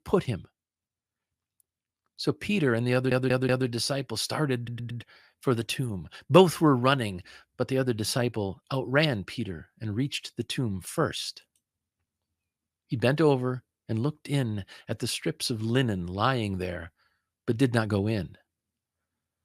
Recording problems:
audio stuttering; at 3 s and at 4.5 s

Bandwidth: 15 kHz